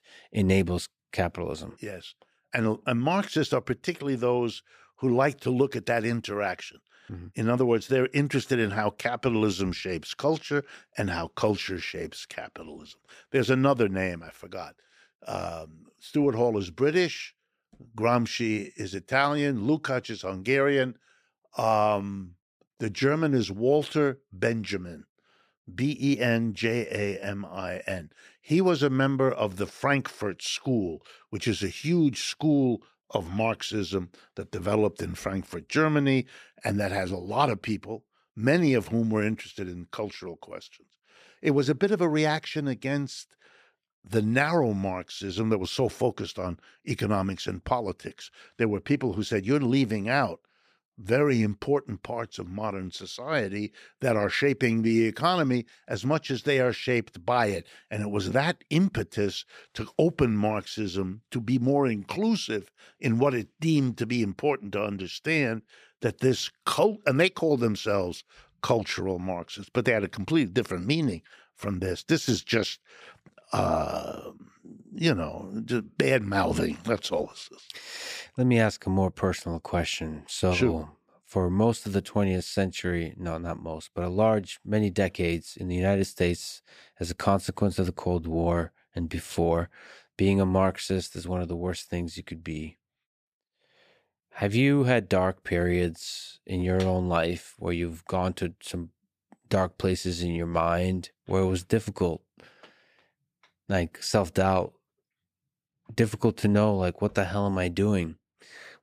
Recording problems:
none

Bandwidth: 15 kHz